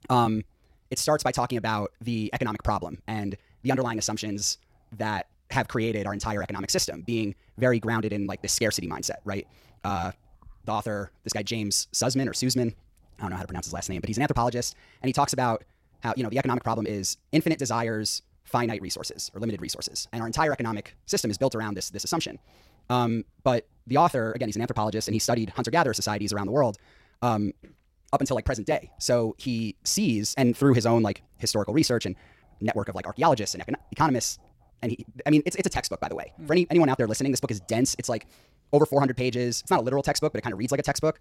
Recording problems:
wrong speed, natural pitch; too fast; 1.8 times normal speed

